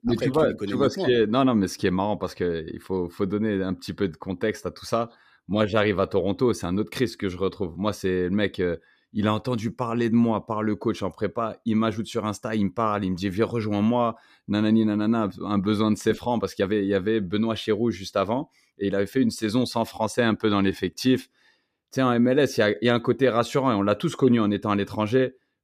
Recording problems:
uneven, jittery; slightly; from 5.5 to 21 s

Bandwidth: 15 kHz